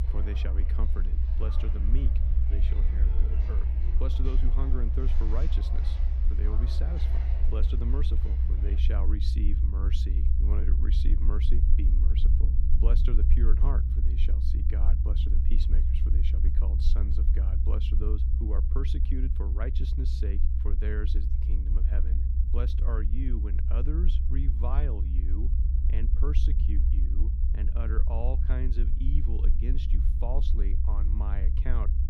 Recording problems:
low rumble; loud; throughout; 3 dB below the speech
footsteps; noticeable; until 9 s; peak 7 dB below the speech

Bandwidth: 14.5 kHz